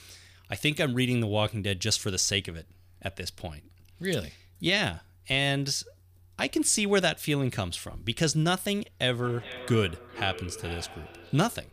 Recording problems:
echo of what is said; noticeable; from 9 s on; 410 ms later, 15 dB below the speech

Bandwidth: 15 kHz